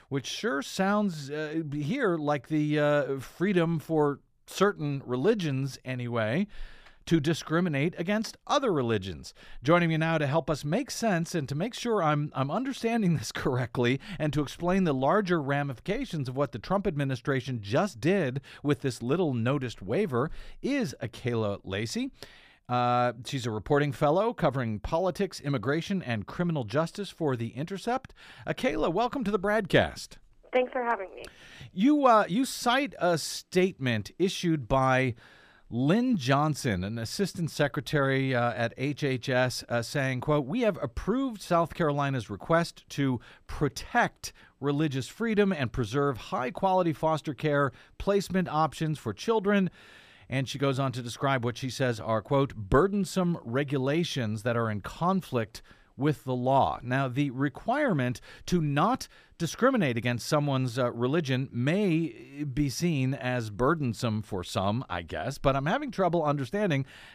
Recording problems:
none

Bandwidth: 15 kHz